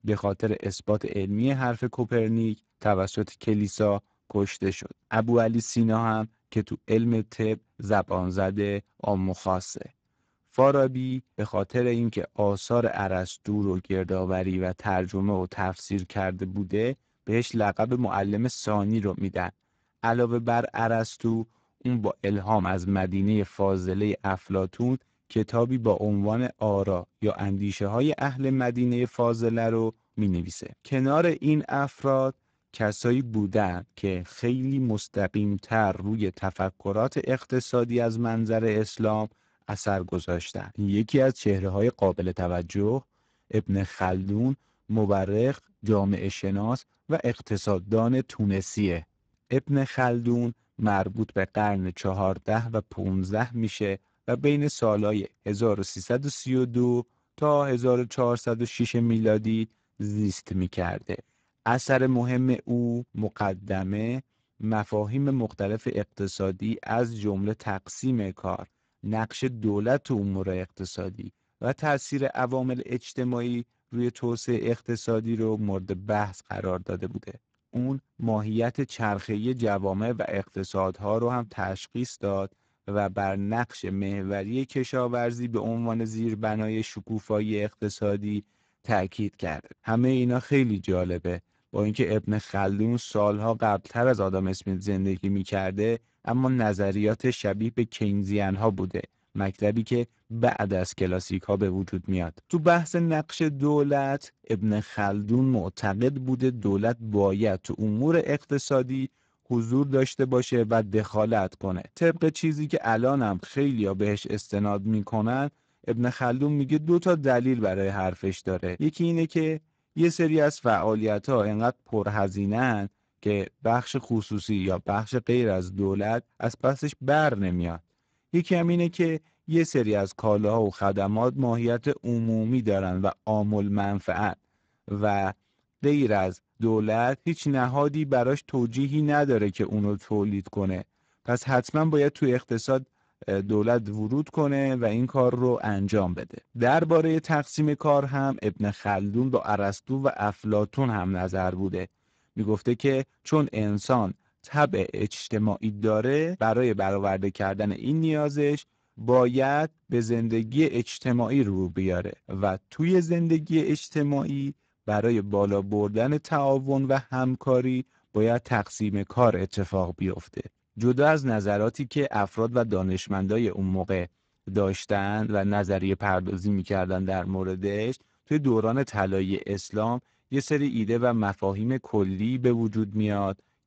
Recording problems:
garbled, watery; badly; nothing above 7.5 kHz

